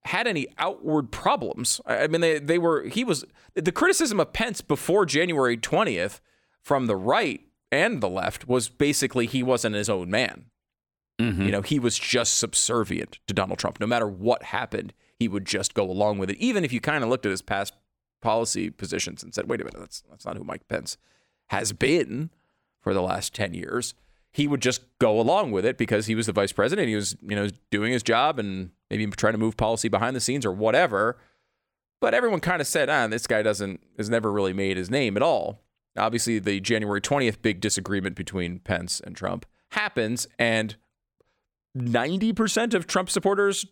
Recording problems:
none

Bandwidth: 17.5 kHz